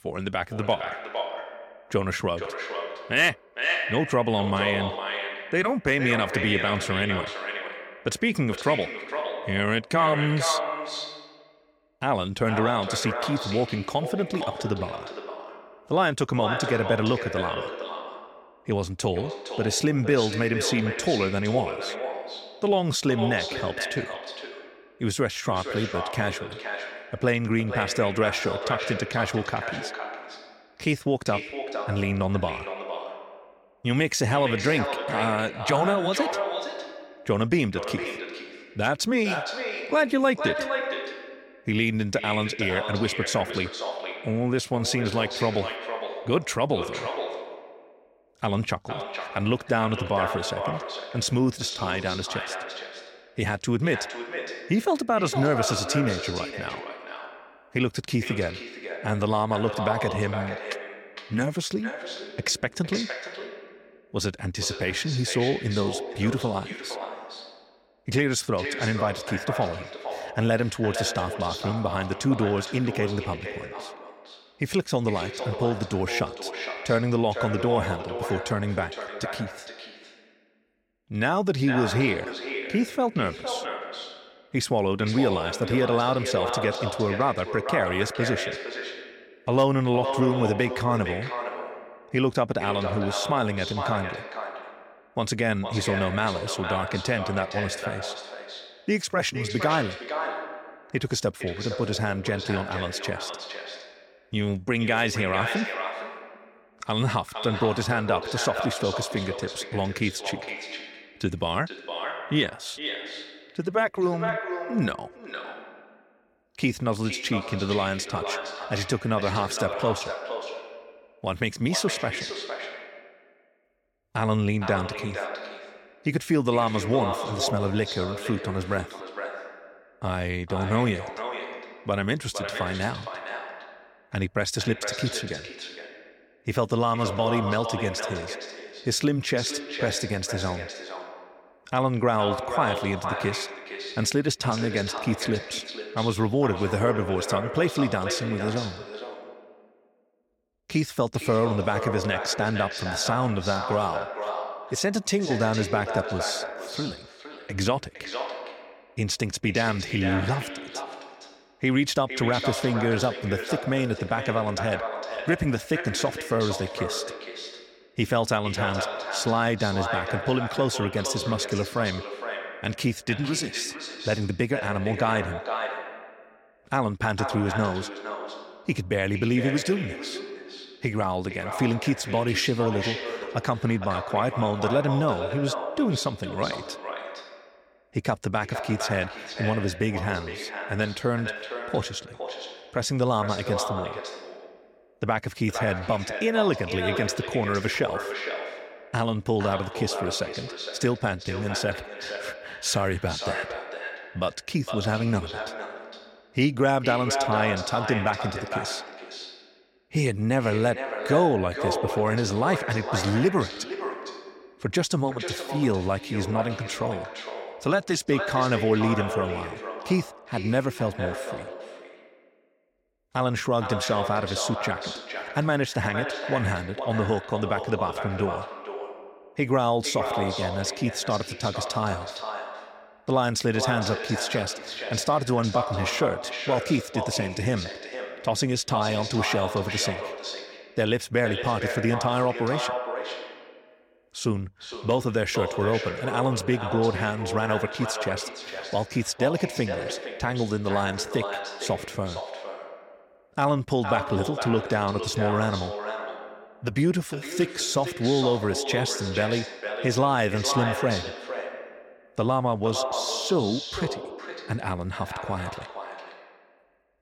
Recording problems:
echo of what is said; strong; throughout; 460 ms later, 6 dB below the speech

